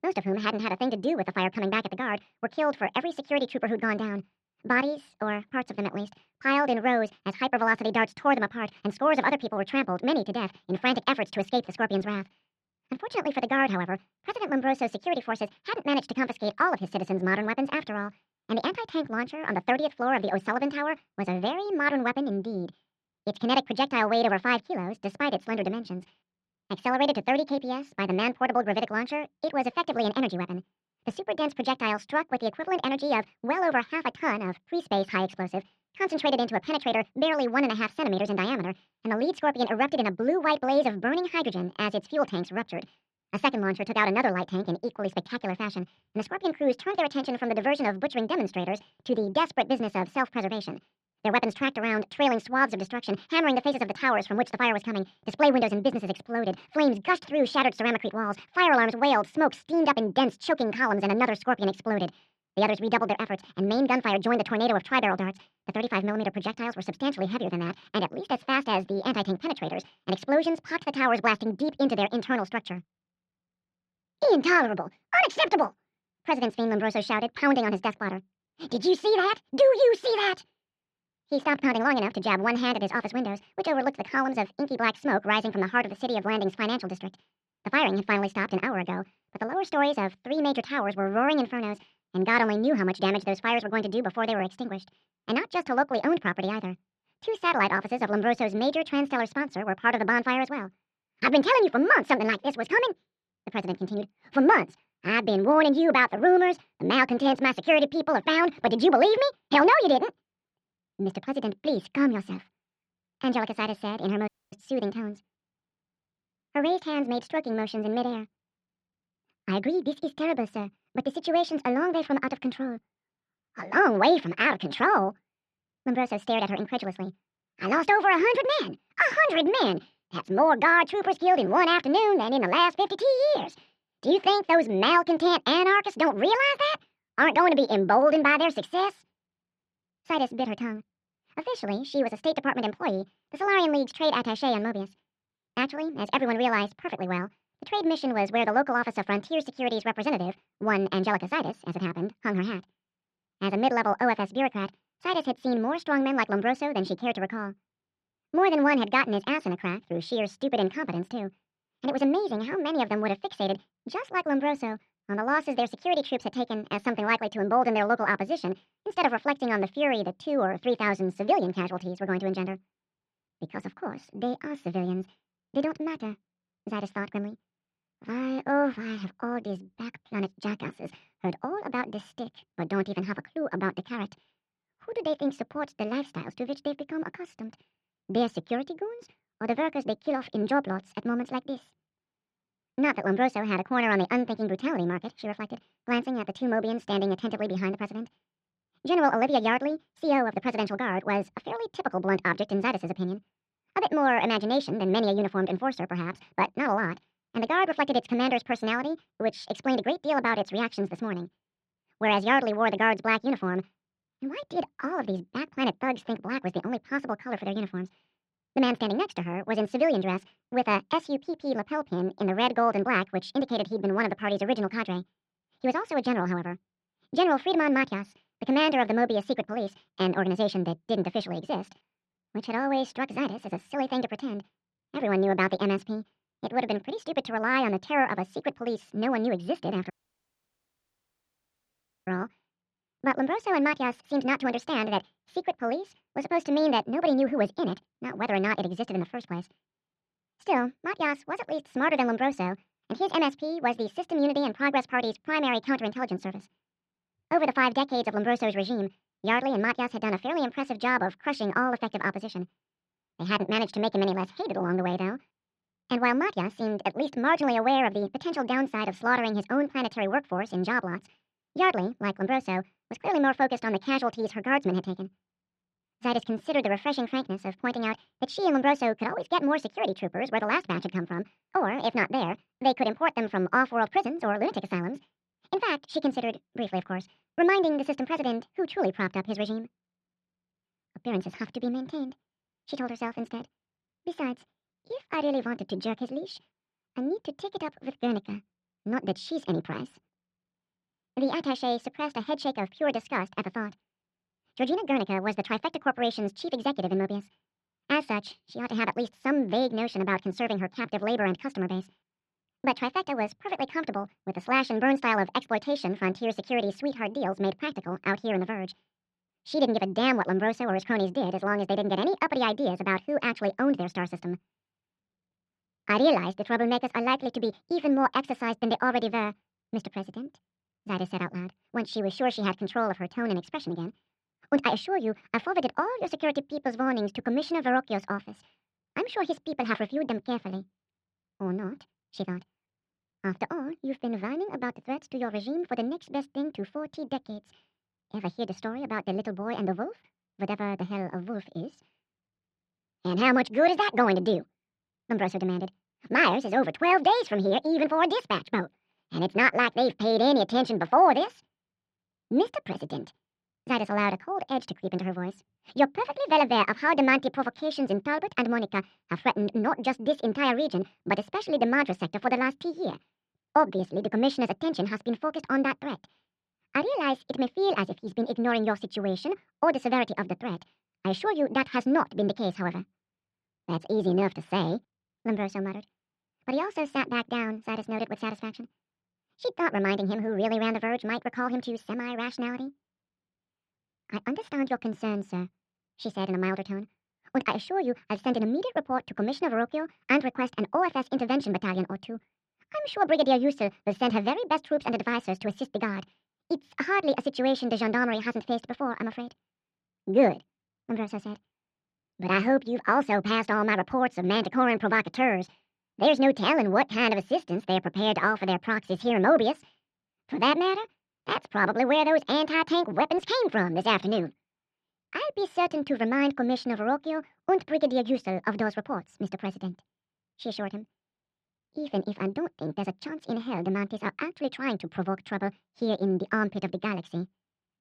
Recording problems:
wrong speed and pitch; too fast and too high; 1.5 times normal speed
muffled; slightly; fading above 4 kHz
audio cutting out; at 1:54 and at 4:00 for 2 s

